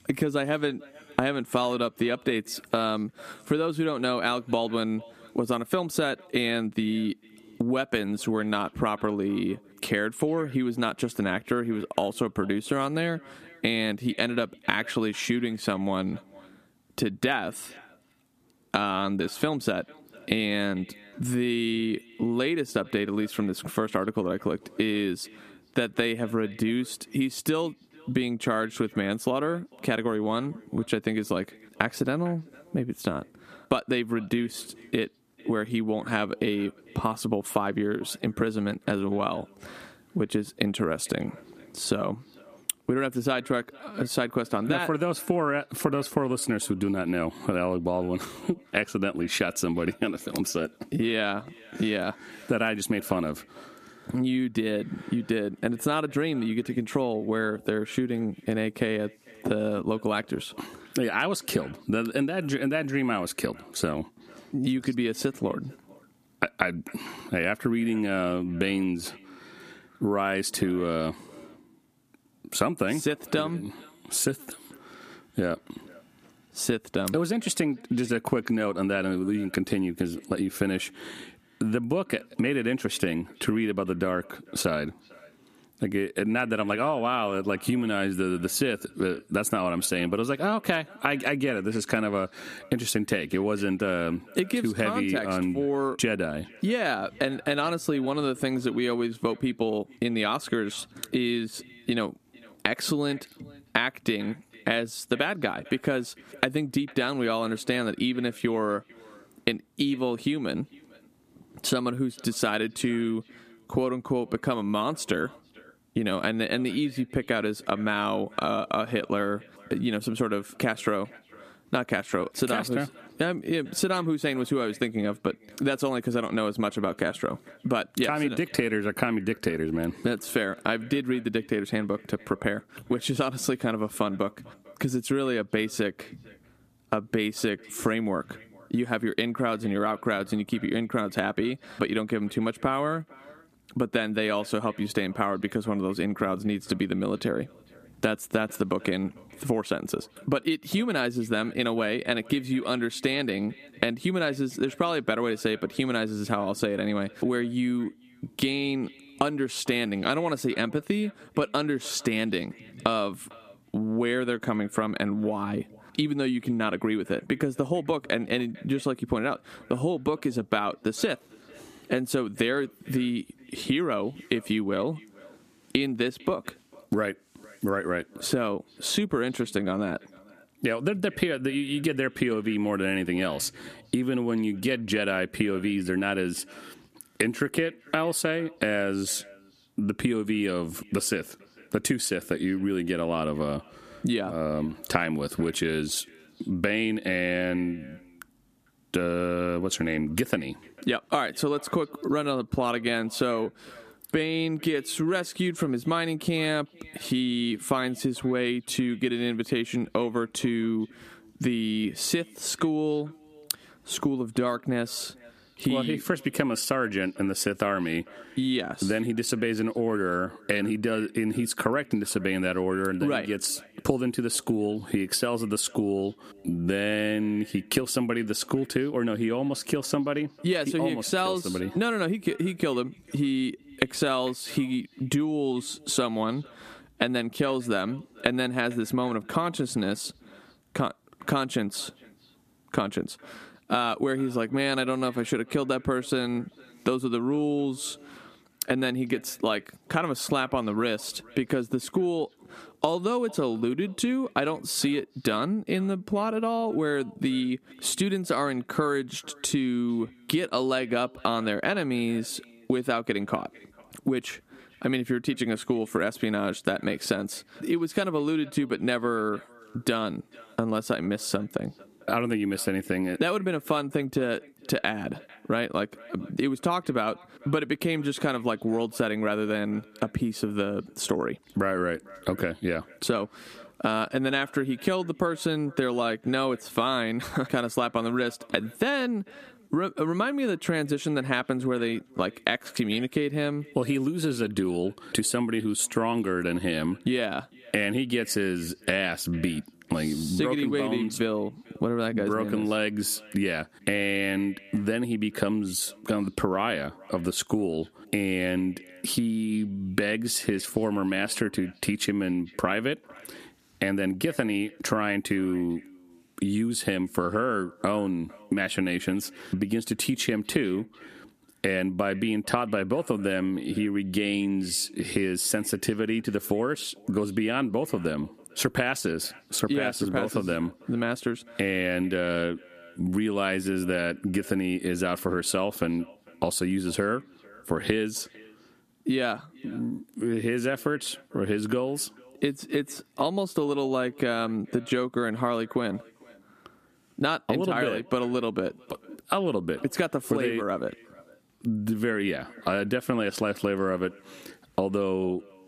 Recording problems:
echo of what is said; faint; throughout; 450 ms later, 25 dB below the speech
squashed, flat; somewhat

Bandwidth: 14.5 kHz